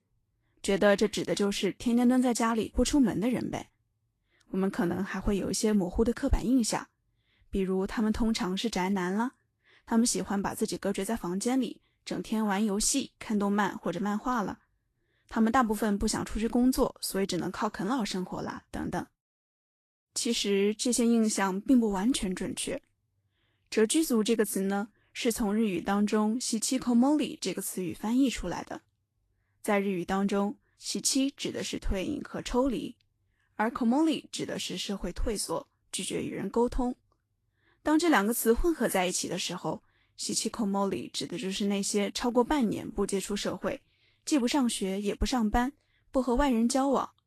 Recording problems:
garbled, watery; slightly; nothing above 13.5 kHz

